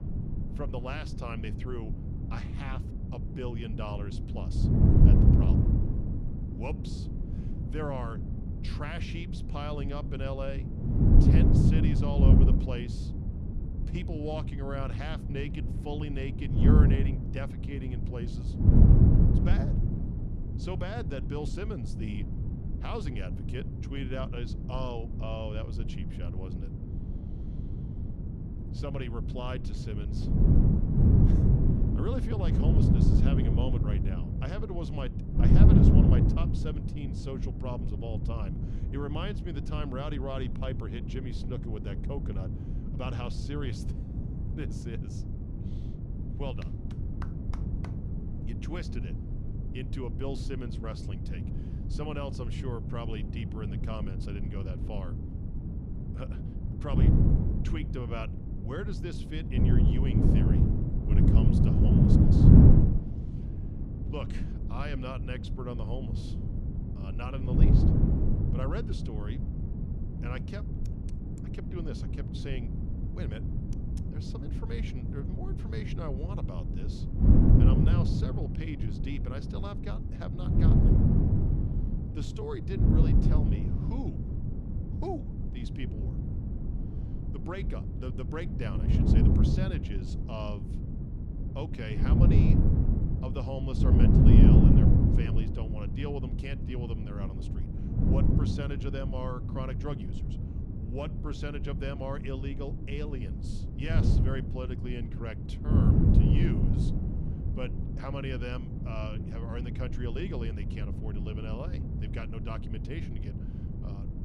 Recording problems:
wind noise on the microphone; heavy; 2 dB above the speech

